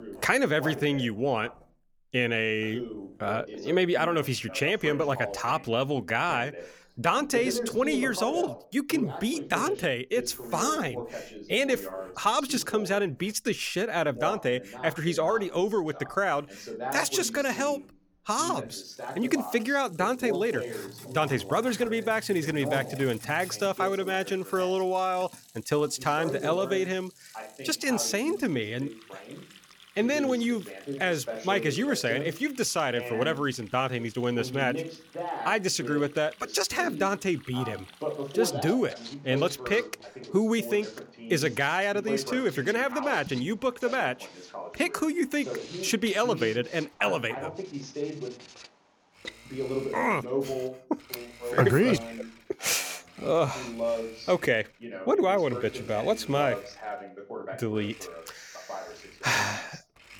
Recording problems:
voice in the background; noticeable; throughout; 10 dB below the speech
household noises; faint; throughout; 20 dB below the speech

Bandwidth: 18.5 kHz